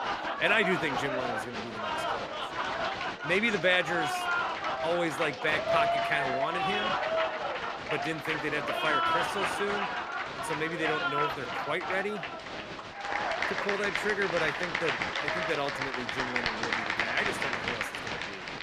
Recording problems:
crowd noise; very loud; throughout; 1 dB above the speech

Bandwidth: 14.5 kHz